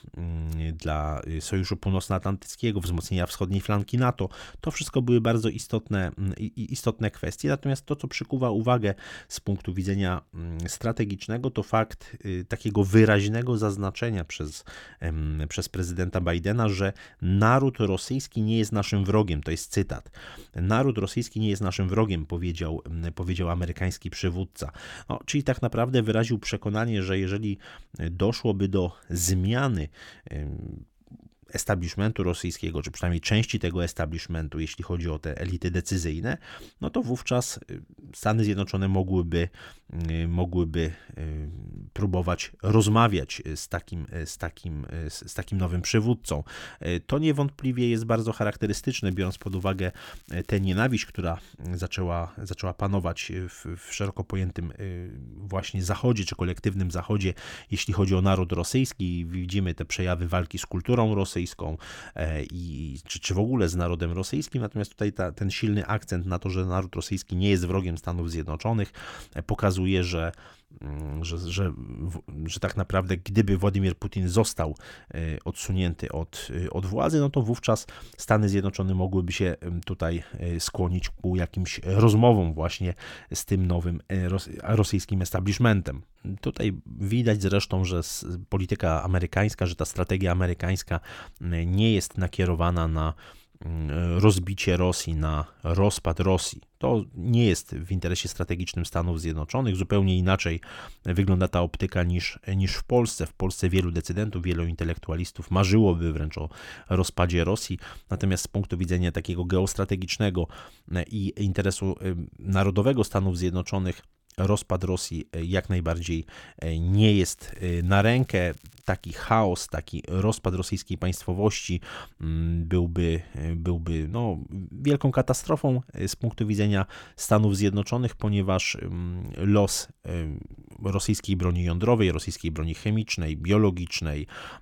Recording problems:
crackling; faint; from 49 to 51 s and from 1:57 to 1:59; 30 dB below the speech

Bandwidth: 17 kHz